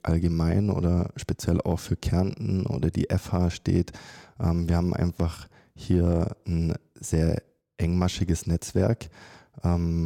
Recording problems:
abrupt cut into speech; at the end

